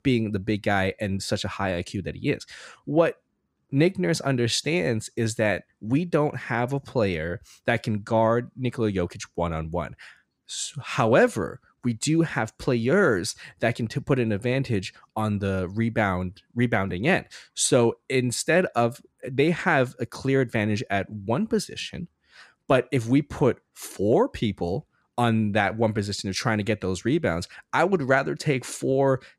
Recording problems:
none

